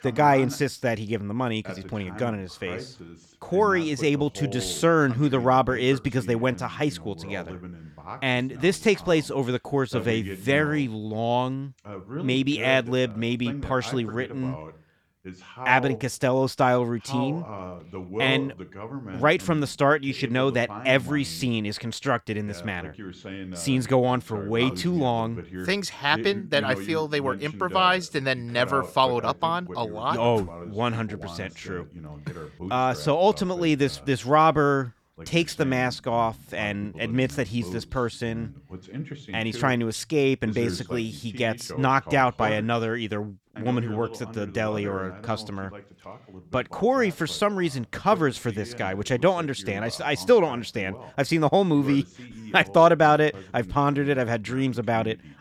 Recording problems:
voice in the background; noticeable; throughout; 15 dB below the speech

